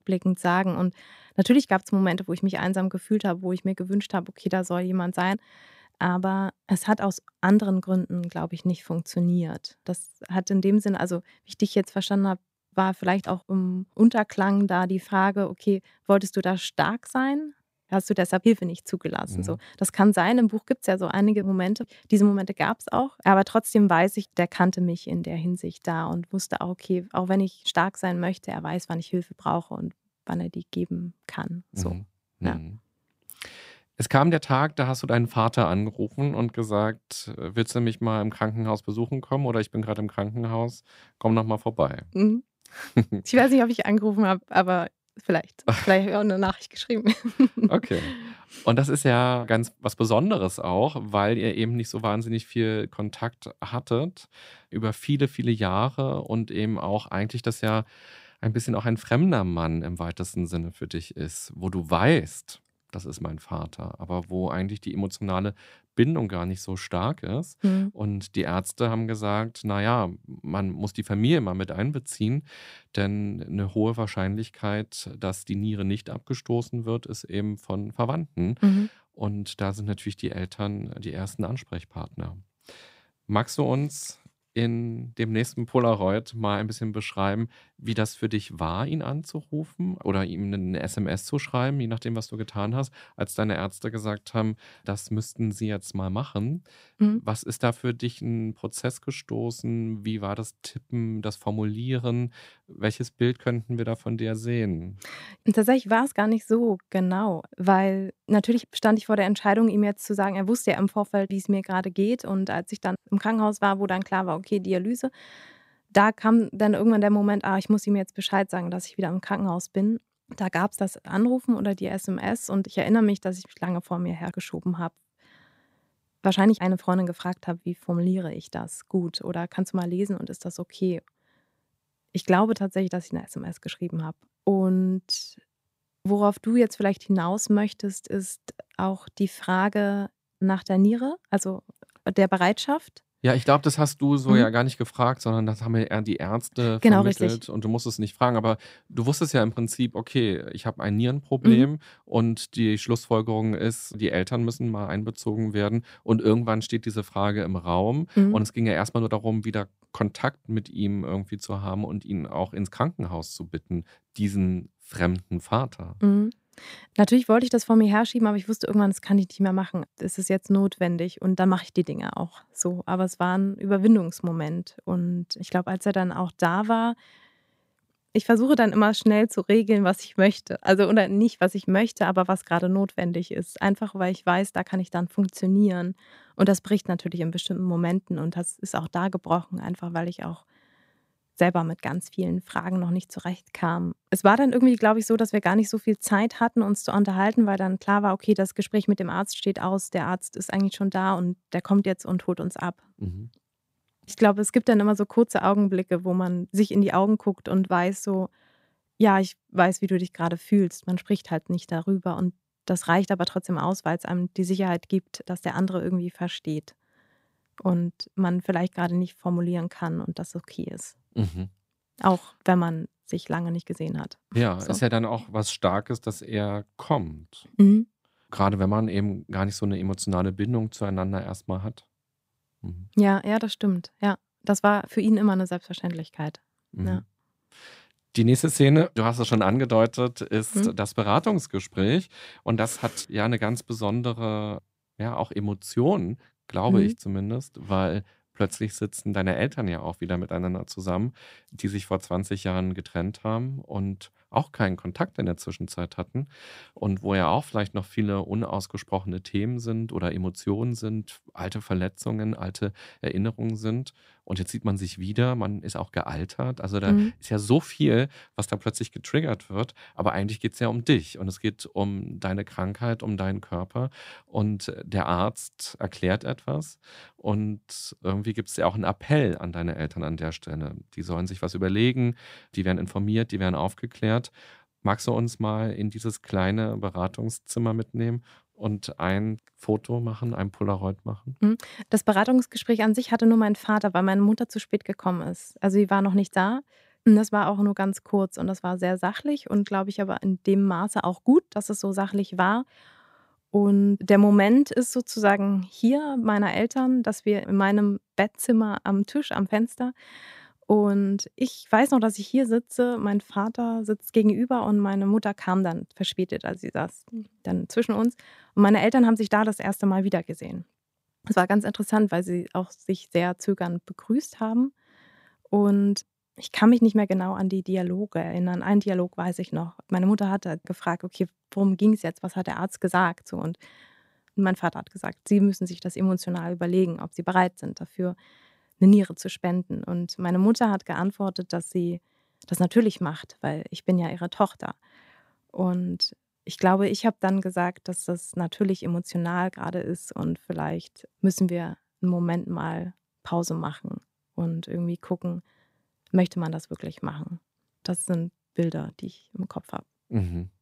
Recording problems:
none

